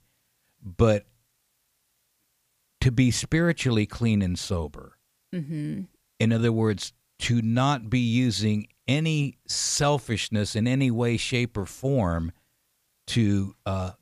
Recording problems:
none

